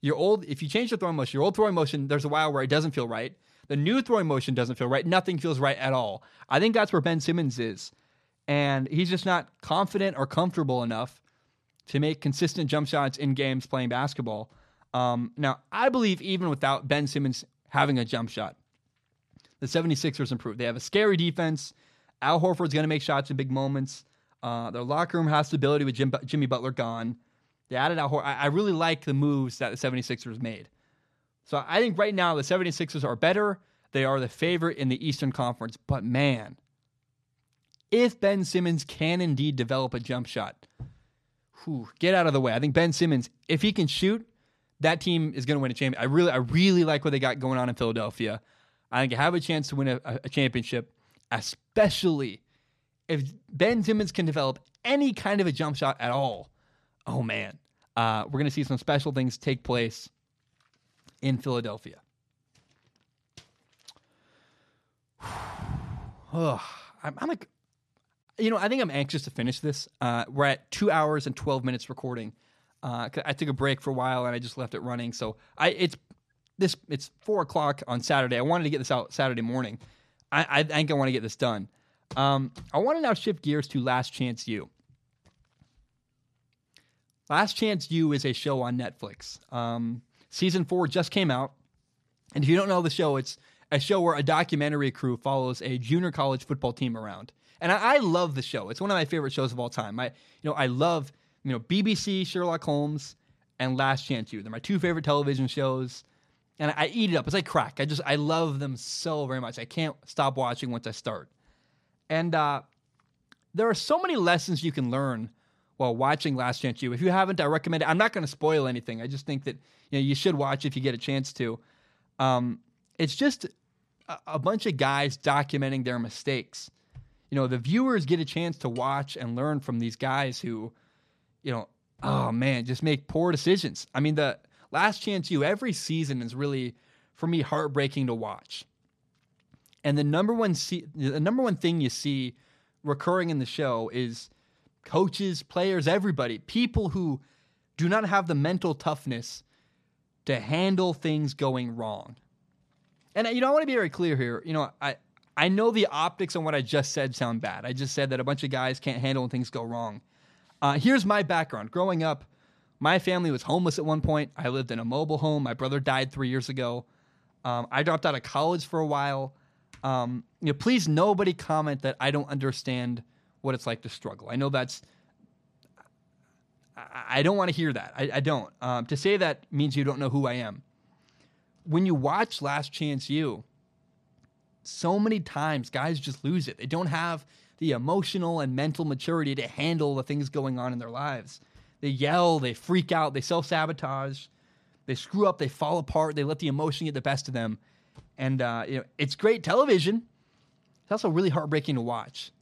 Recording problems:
none

